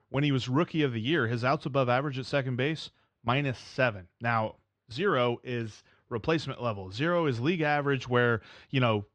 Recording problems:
muffled; slightly; fading above 3.5 kHz

